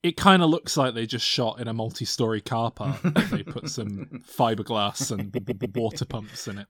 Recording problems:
audio stuttering; at 5.5 s

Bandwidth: 18 kHz